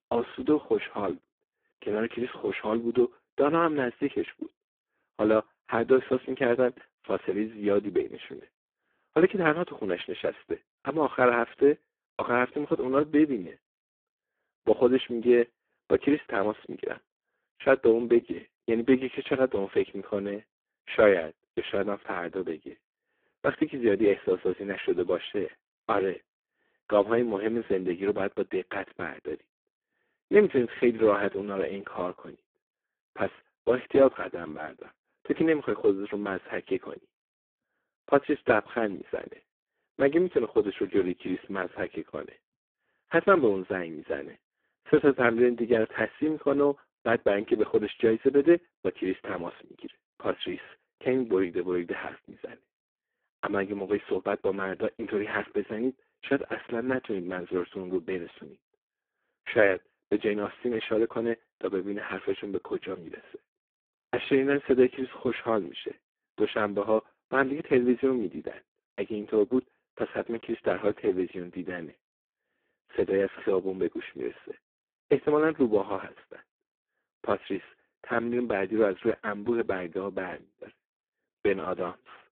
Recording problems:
phone-call audio; poor line

